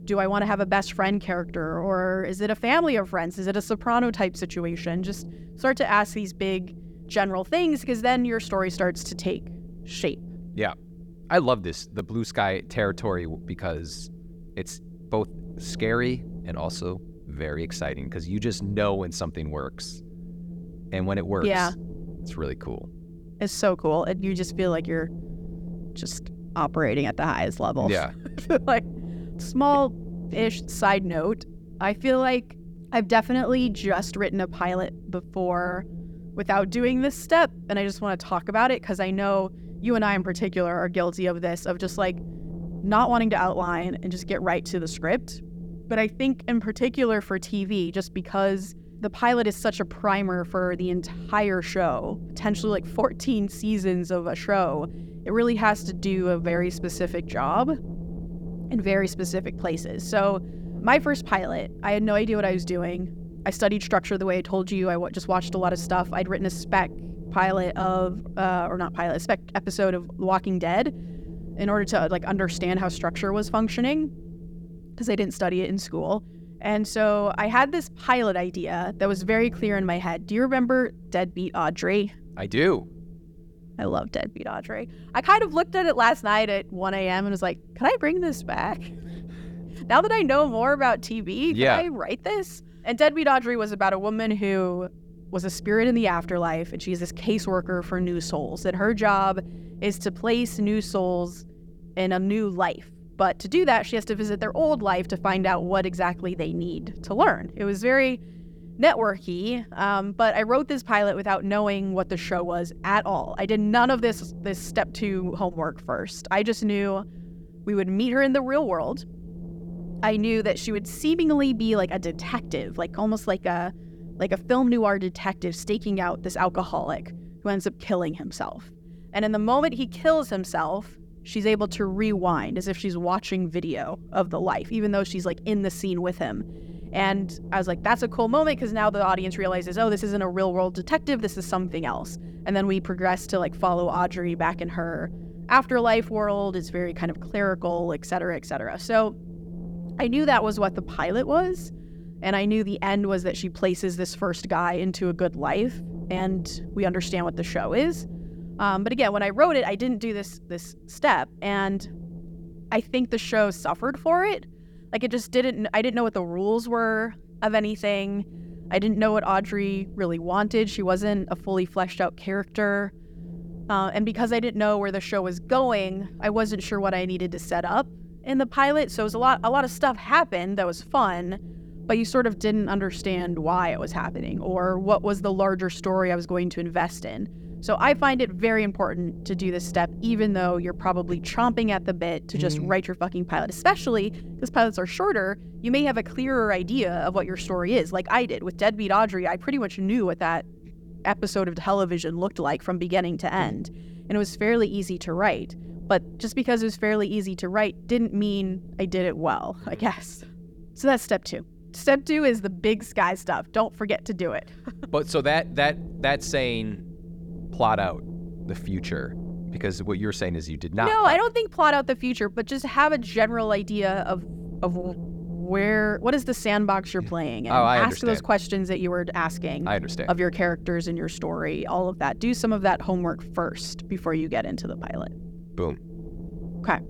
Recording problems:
wind noise on the microphone; occasional gusts; 25 dB below the speech

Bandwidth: 18.5 kHz